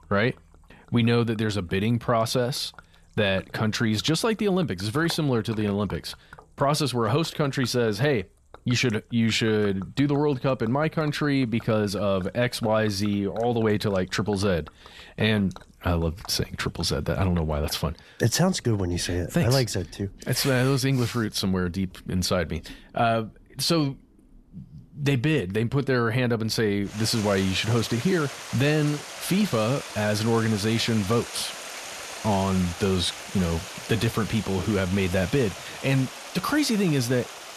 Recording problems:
rain or running water; noticeable; throughout; 15 dB below the speech

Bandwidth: 13.5 kHz